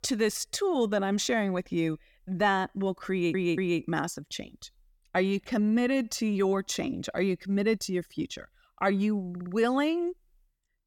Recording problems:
audio stuttering; at 3 s and at 9.5 s

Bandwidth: 17.5 kHz